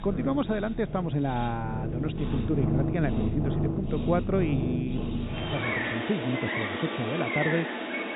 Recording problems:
high frequencies cut off; severe; nothing above 4 kHz
animal sounds; loud; throughout; as loud as the speech

